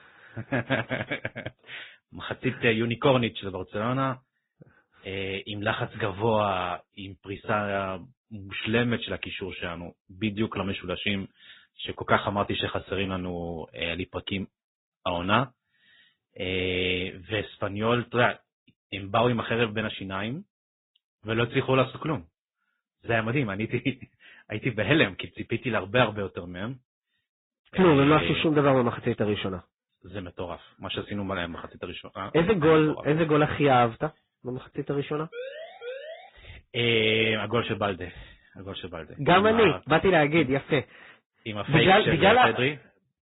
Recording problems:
high frequencies cut off; severe; nothing above 4 kHz
garbled, watery; slightly
siren; faint; at 35 s; peak 10 dB below the speech

